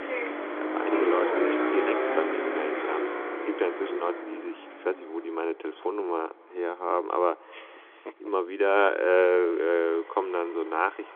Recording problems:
echo of what is said; faint; throughout; 260 ms later, 25 dB below the speech
phone-call audio
traffic noise; loud; throughout; 1 dB below the speech

